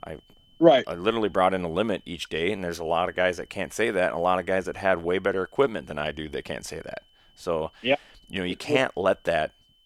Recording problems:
high-pitched whine; faint; throughout; 3 kHz, 35 dB below the speech

